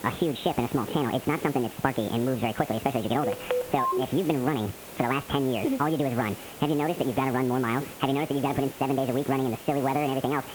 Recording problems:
high frequencies cut off; severe; nothing above 3.5 kHz
wrong speed and pitch; too fast and too high; 1.6 times normal speed
squashed, flat; somewhat
hiss; noticeable; throughout; 15 dB below the speech
phone ringing; noticeable; at 3 s; peak 1 dB below the speech

